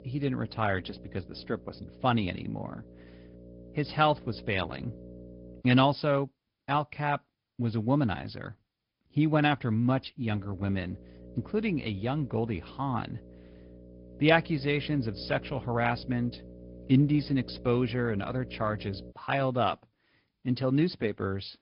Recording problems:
high frequencies cut off; noticeable; nothing above 5 kHz
garbled, watery; slightly
electrical hum; faint; until 5.5 s and from 10 to 19 s; 60 Hz, 20 dB below the speech

